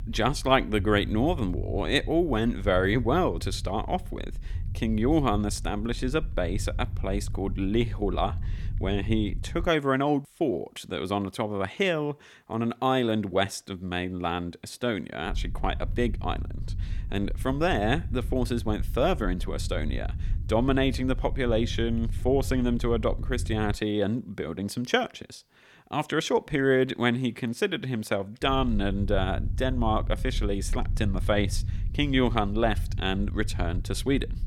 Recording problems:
low rumble; faint; until 9.5 s, from 15 to 24 s and from 28 s on; 20 dB below the speech

